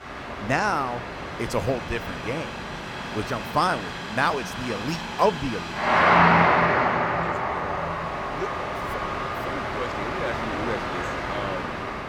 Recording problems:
train or aircraft noise; very loud; throughout; 3 dB above the speech

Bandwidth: 18 kHz